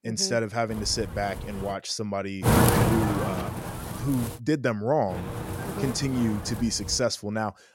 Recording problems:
wind noise on the microphone; heavy; from 0.5 to 1.5 s, from 2.5 to 4.5 s and from 5 to 7 s; 1 dB below the speech

